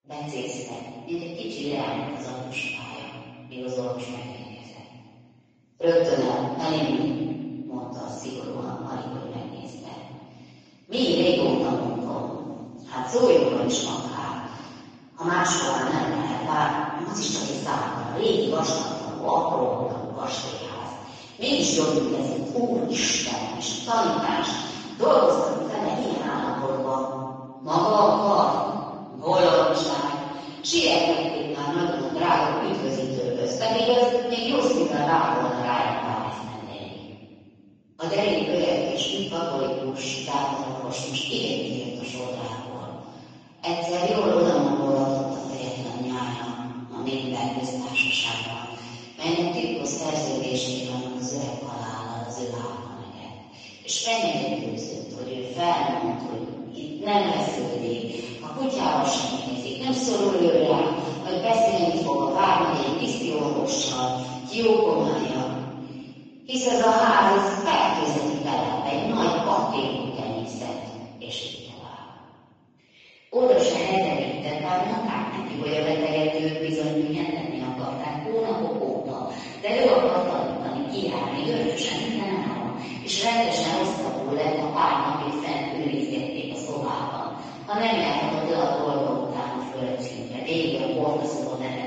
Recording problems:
room echo; strong; dies away in 1.9 s
off-mic speech; far
garbled, watery; slightly

